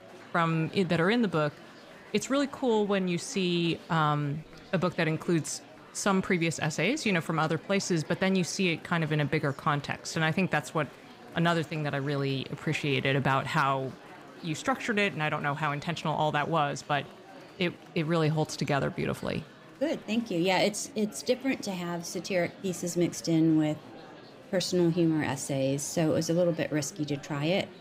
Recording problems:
murmuring crowd; noticeable; throughout; 20 dB below the speech

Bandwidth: 15.5 kHz